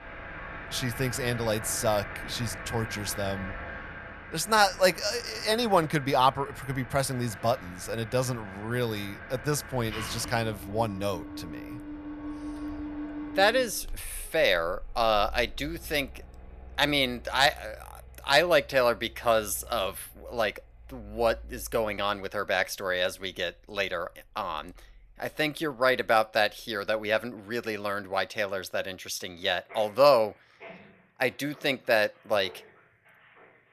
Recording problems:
machinery noise; noticeable; throughout; 15 dB below the speech

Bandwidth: 14 kHz